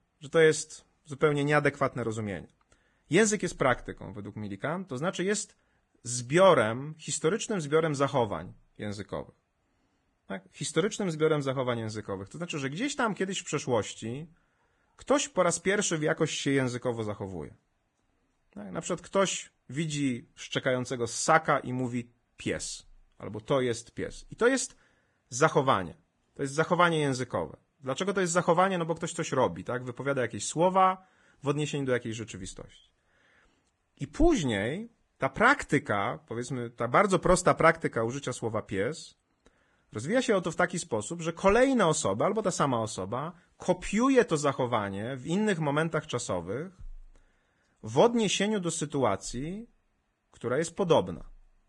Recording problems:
garbled, watery; badly

